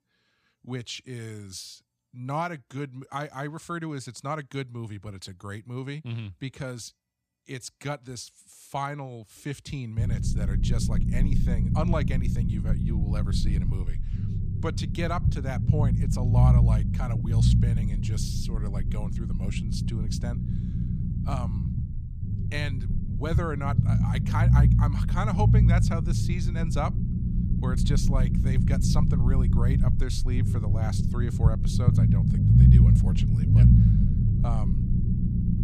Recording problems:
low rumble; loud; from 10 s on; 1 dB below the speech

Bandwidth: 15 kHz